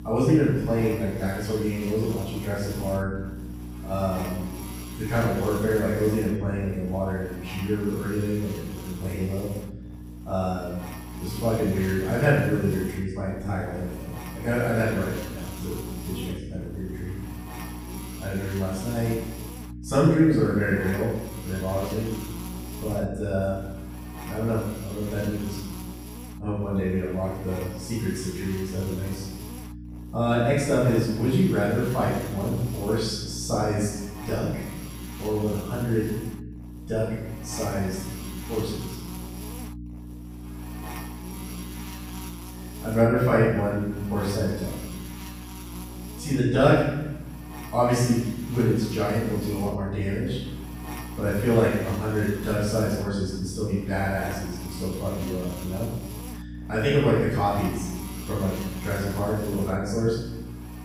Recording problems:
room echo; strong; dies away in 0.9 s
off-mic speech; far
electrical hum; noticeable; throughout; 60 Hz, 15 dB below the speech

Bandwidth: 15 kHz